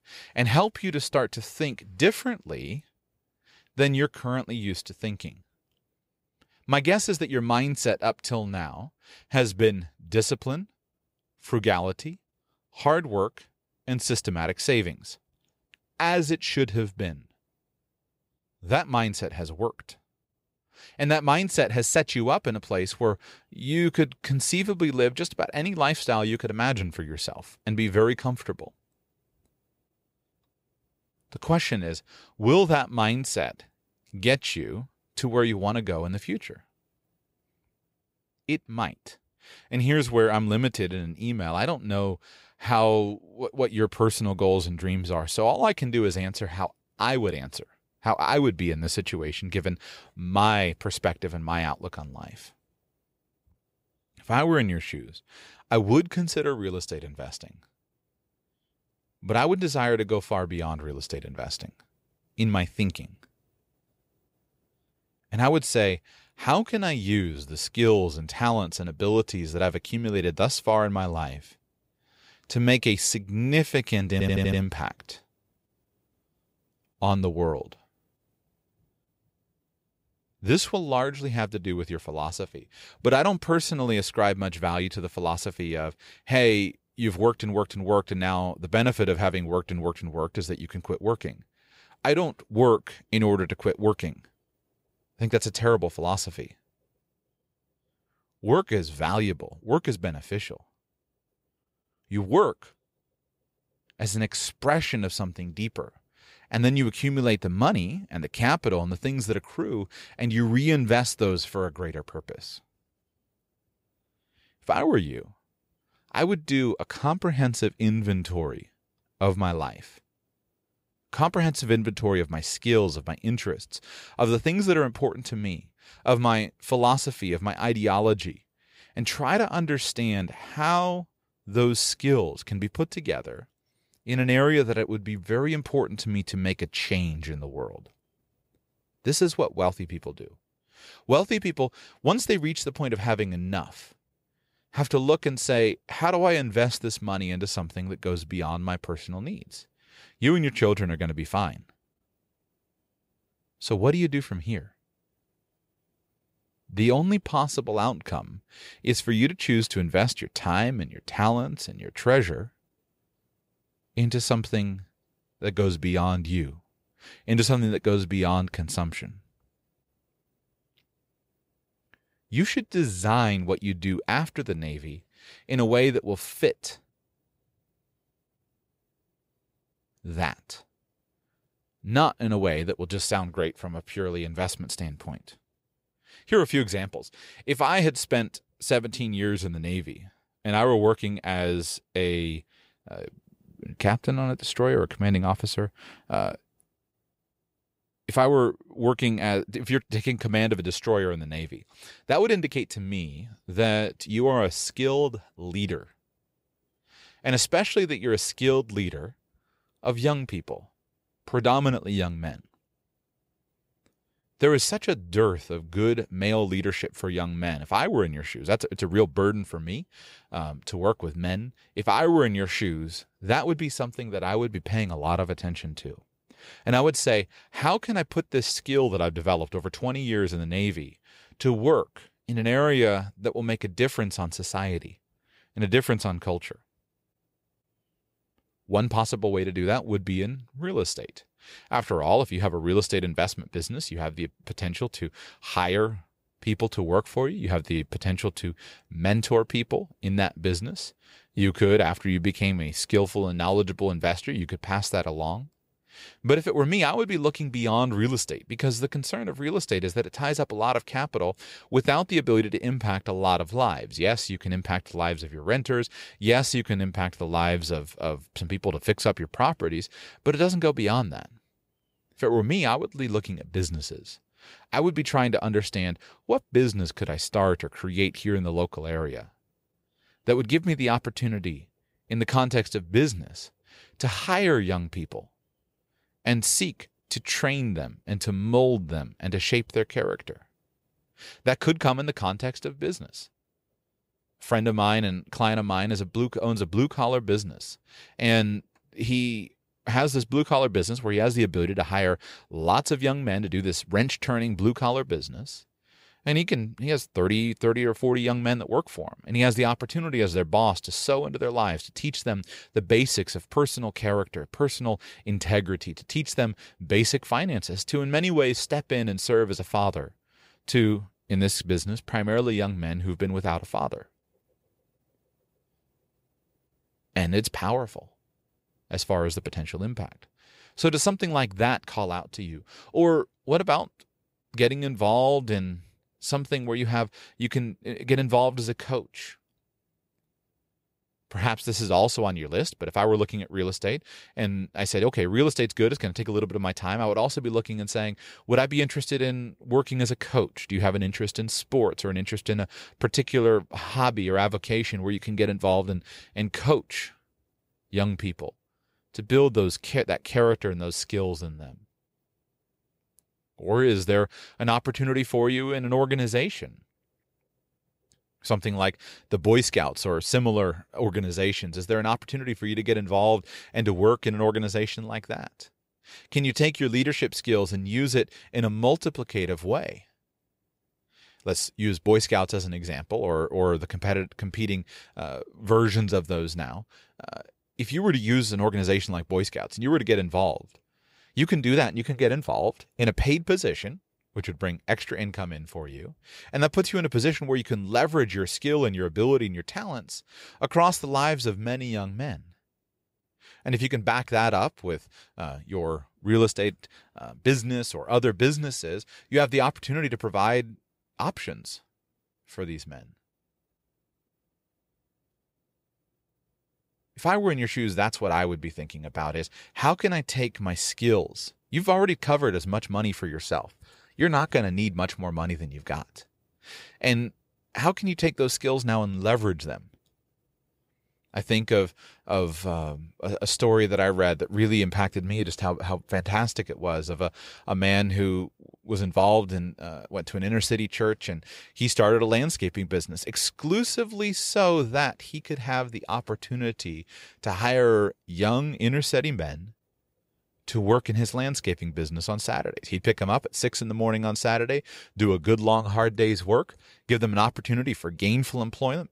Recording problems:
audio stuttering; at 1:14

